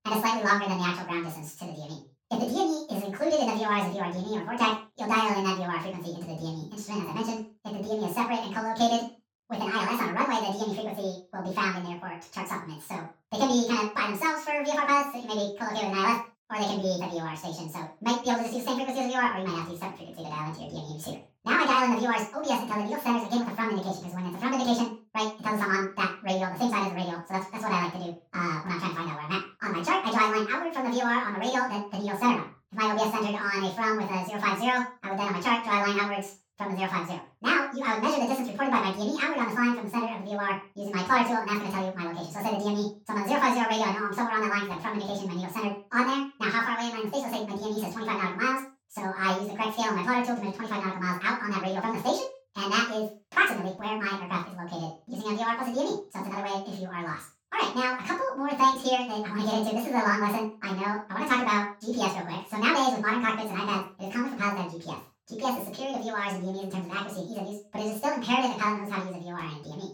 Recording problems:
off-mic speech; far
wrong speed and pitch; too fast and too high; 1.7 times normal speed
room echo; noticeable; dies away in 0.3 s

